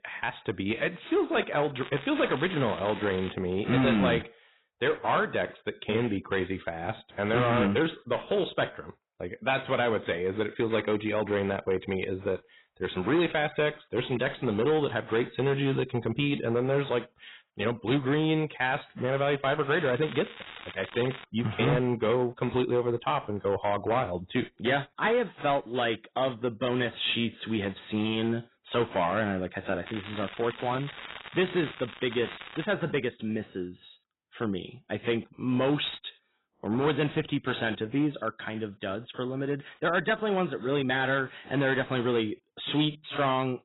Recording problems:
garbled, watery; badly; nothing above 4 kHz
distortion; slight; 5% of the sound clipped
crackling; noticeable; from 2 to 3.5 s, from 20 to 21 s and from 30 to 33 s; 15 dB below the speech

